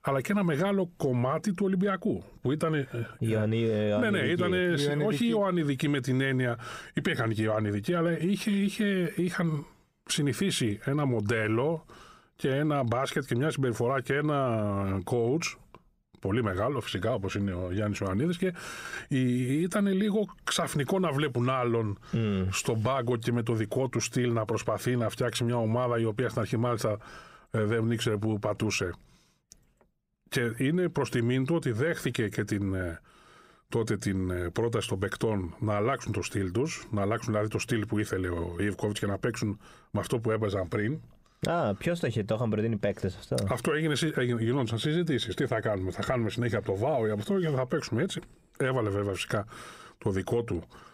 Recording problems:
squashed, flat; somewhat

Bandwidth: 15.5 kHz